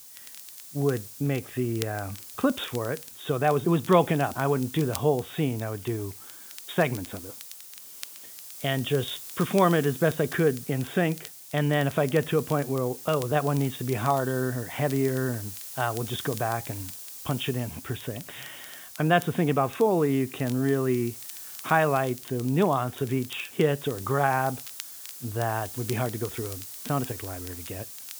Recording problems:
high frequencies cut off; severe; nothing above 4 kHz
hiss; noticeable; throughout; 15 dB below the speech
crackle, like an old record; faint; 20 dB below the speech

